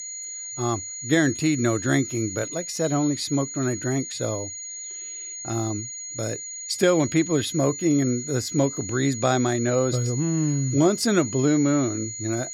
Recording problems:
high-pitched whine; loud; throughout; 7 kHz, 8 dB below the speech

